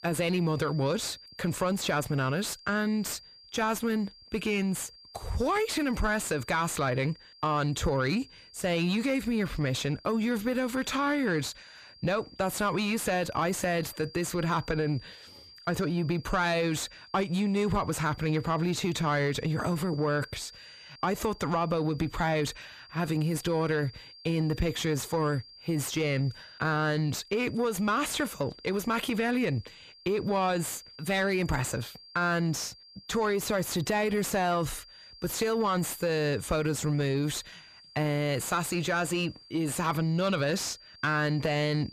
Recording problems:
distortion; slight; 10 dB below the speech
high-pitched whine; faint; throughout; 4.5 kHz, 20 dB below the speech

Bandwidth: 14.5 kHz